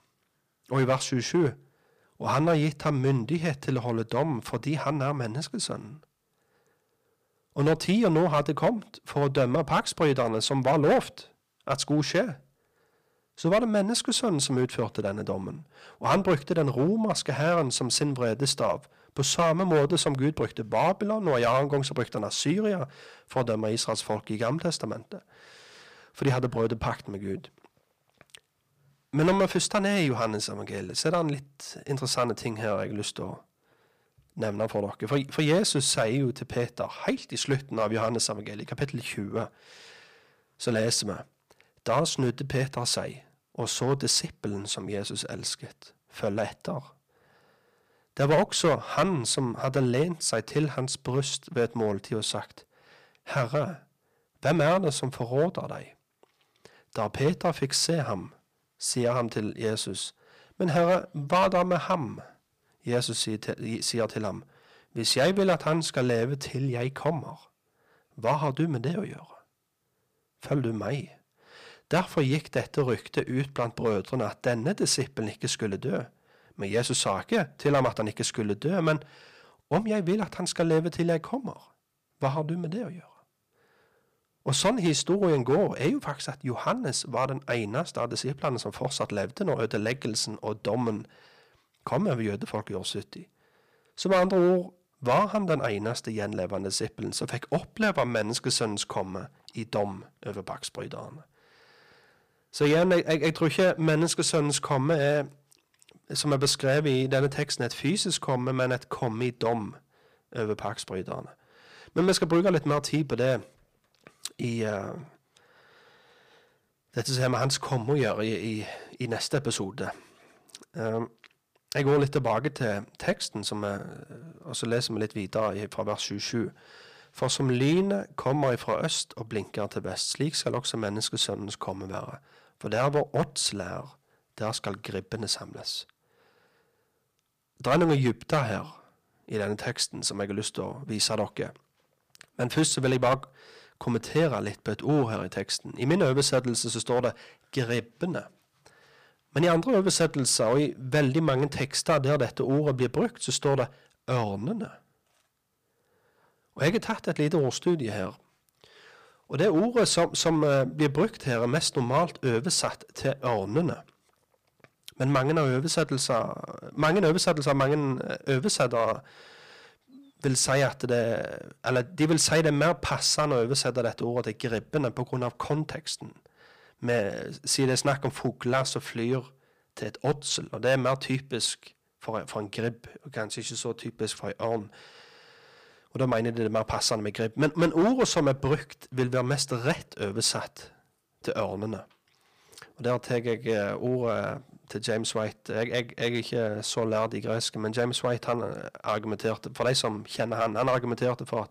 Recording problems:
distortion; slight; 3% of the sound clipped

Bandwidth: 15 kHz